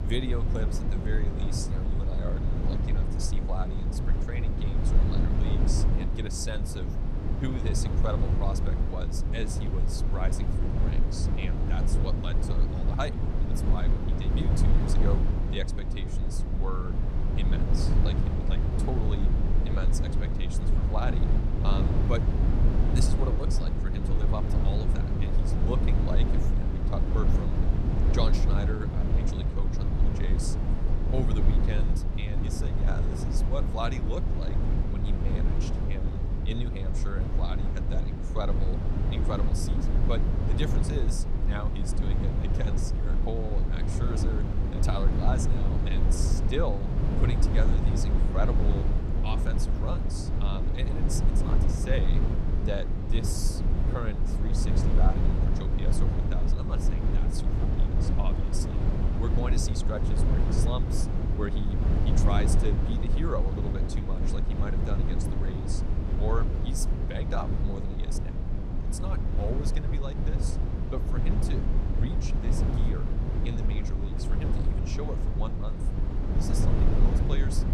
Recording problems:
low rumble; loud; throughout; as loud as the speech

